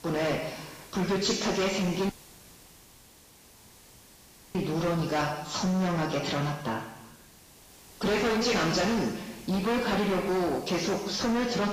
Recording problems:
distortion; heavy; 22% of the sound clipped
garbled, watery; badly; nothing above 7.5 kHz
room echo; noticeable; dies away in 1 s
off-mic speech; somewhat distant
hiss; faint; throughout; 20 dB below the speech
audio cutting out; at 2 s for 2.5 s

